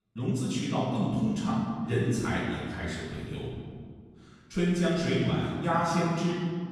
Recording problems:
room echo; strong; dies away in 1.8 s
off-mic speech; far

